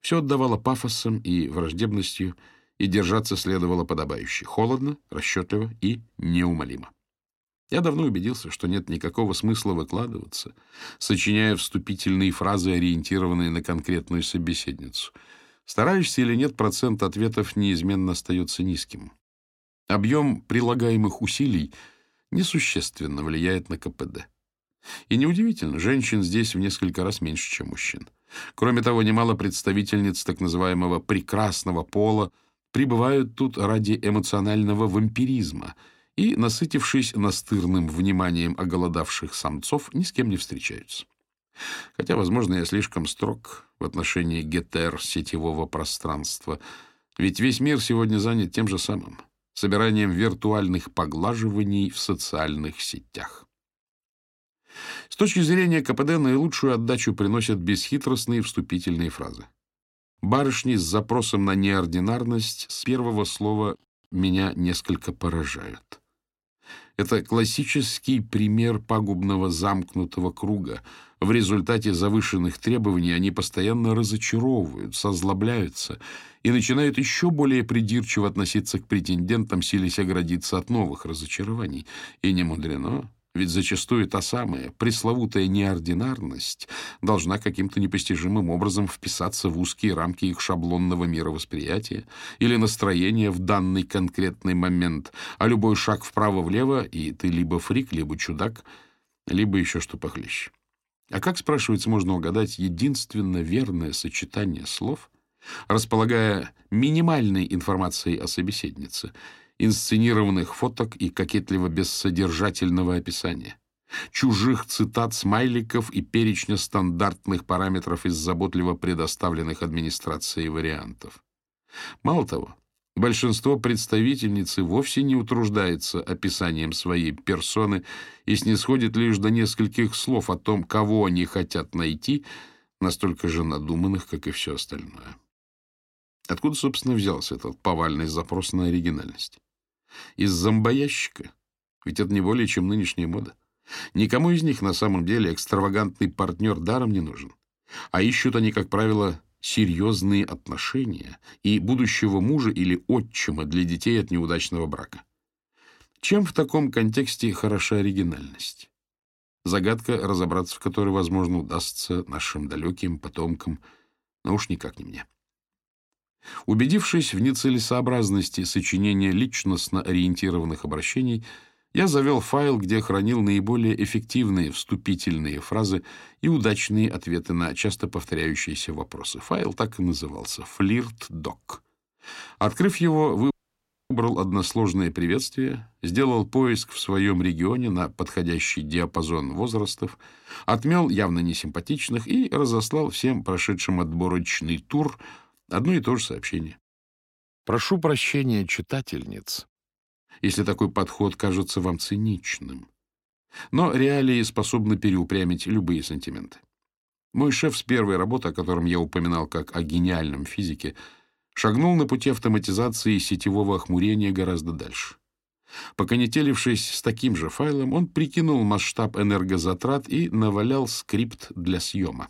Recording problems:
audio cutting out; at 3:03 for 0.5 s

